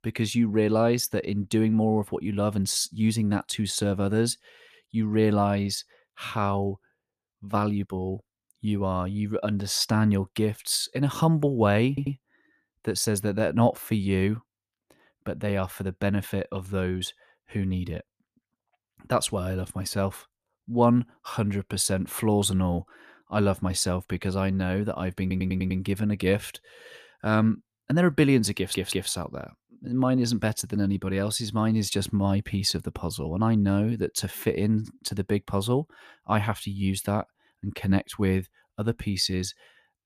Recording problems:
audio stuttering; at 12 s, at 25 s and at 29 s

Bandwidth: 14.5 kHz